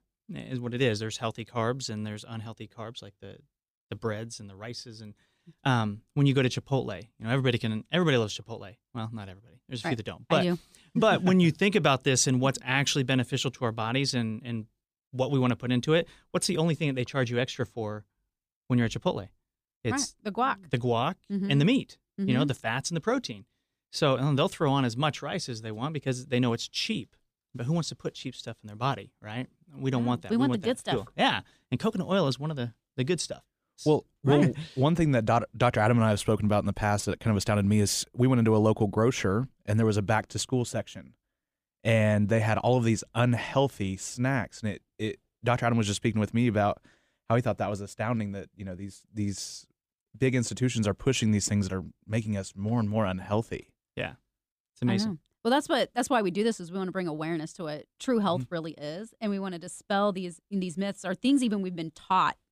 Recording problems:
none

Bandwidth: 15 kHz